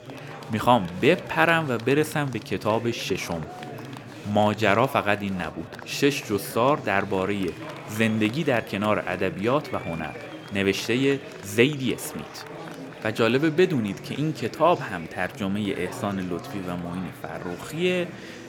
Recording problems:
murmuring crowd; noticeable; throughout; 15 dB below the speech

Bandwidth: 17.5 kHz